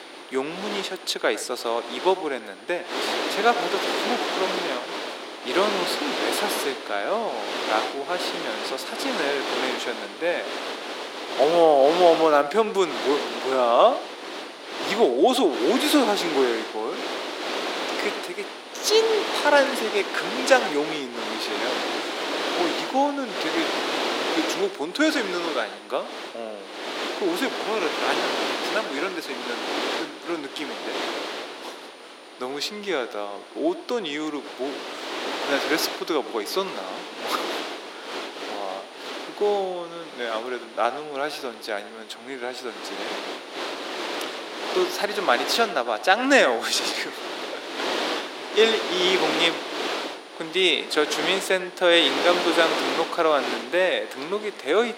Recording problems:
thin; very; fading below 300 Hz
echo of what is said; noticeable; throughout; 100 ms later, 15 dB below the speech
wind noise on the microphone; heavy; 4 dB below the speech
high-pitched whine; faint; throughout; 9.5 kHz, 35 dB below the speech

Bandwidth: 16 kHz